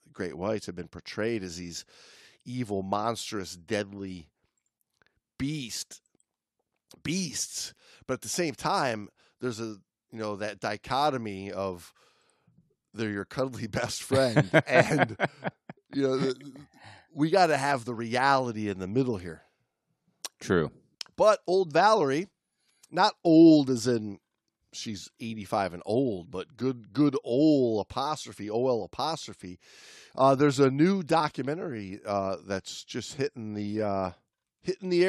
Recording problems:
abrupt cut into speech; at the end

